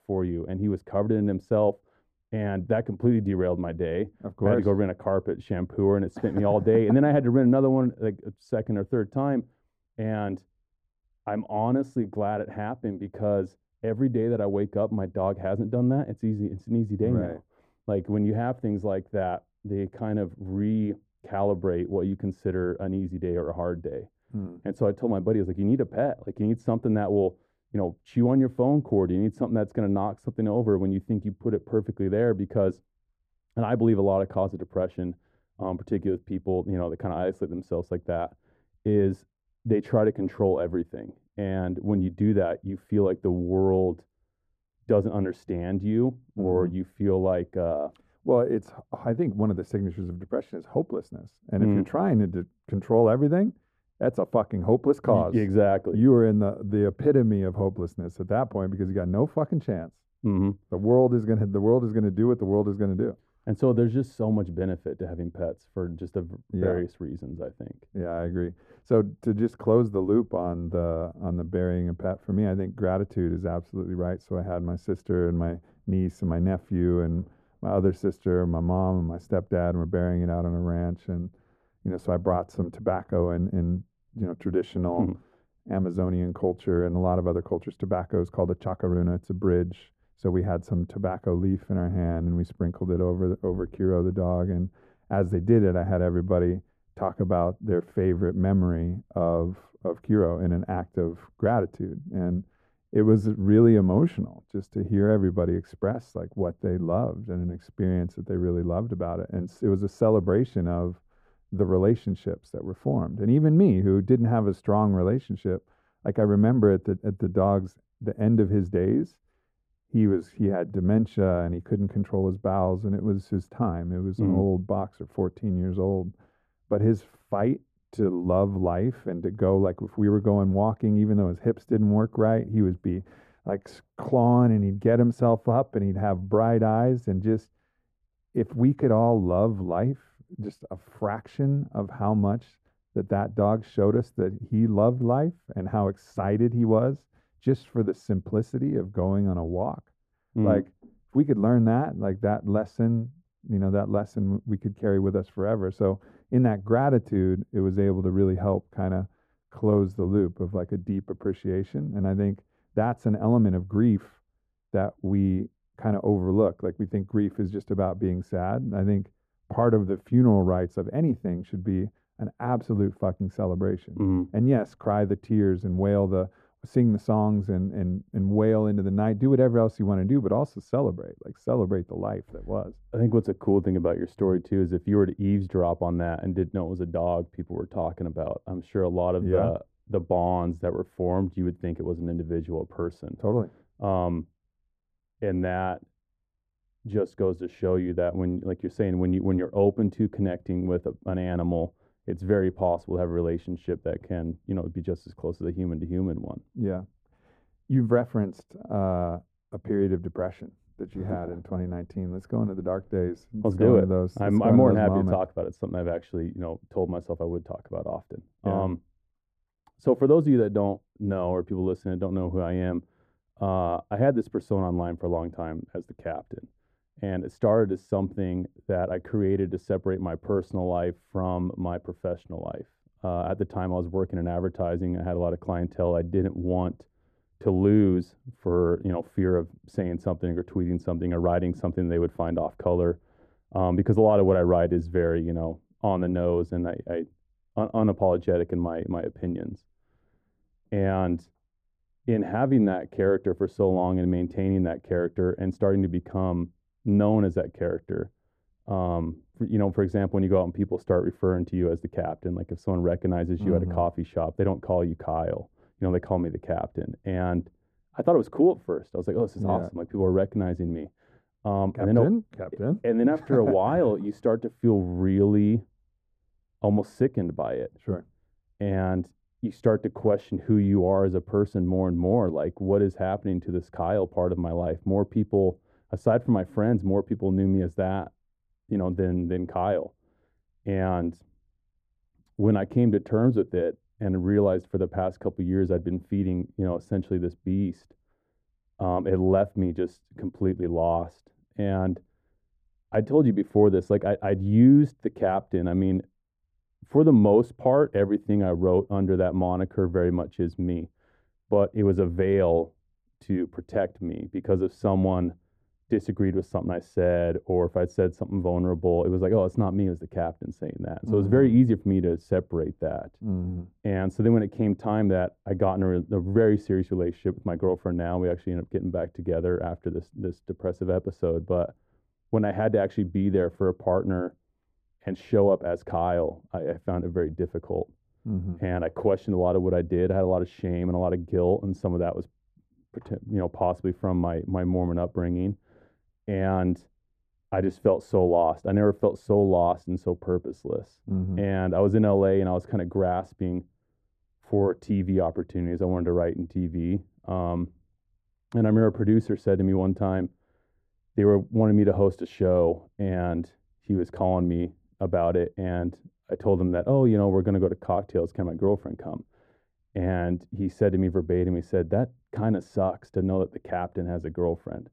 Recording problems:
muffled; very; fading above 1.5 kHz

